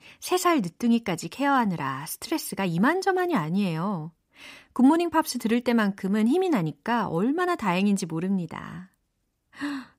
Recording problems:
none

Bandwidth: 15.5 kHz